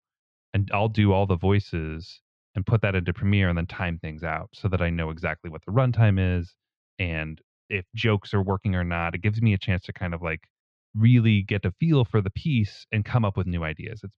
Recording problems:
muffled; slightly; fading above 4 kHz

